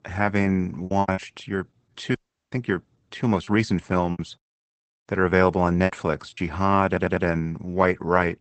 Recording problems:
garbled, watery; badly; nothing above 8 kHz
choppy; very; at 1 s and from 3.5 to 6.5 s; 10% of the speech affected
audio cutting out; at 2 s
audio stuttering; at 7 s

